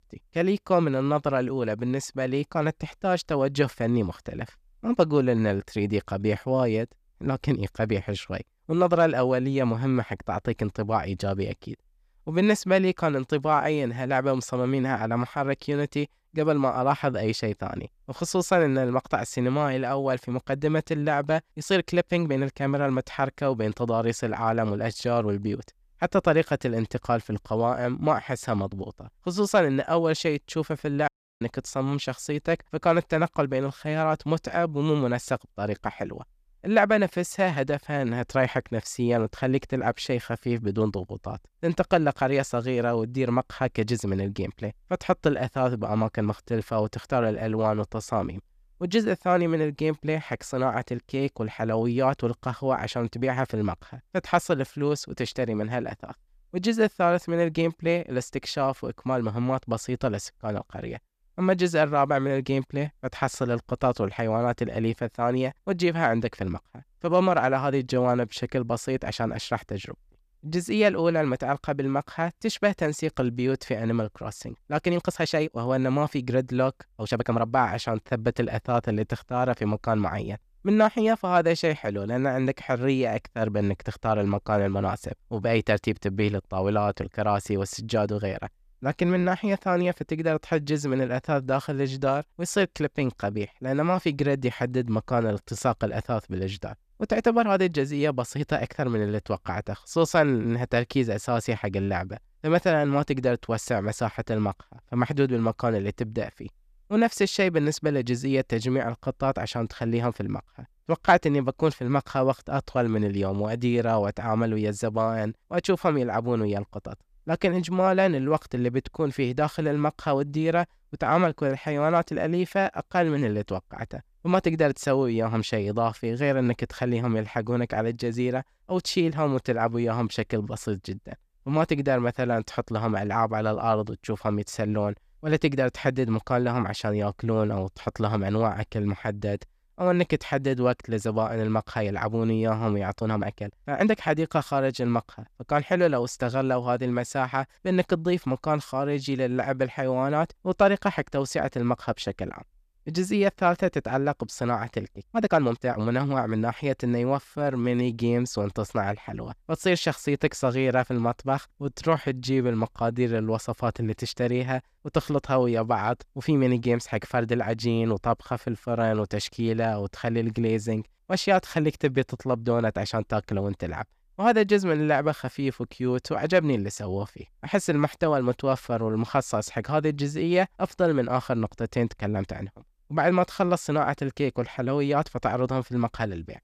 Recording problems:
uneven, jittery; strongly; from 22 s to 2:43
audio cutting out; at 31 s

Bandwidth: 14.5 kHz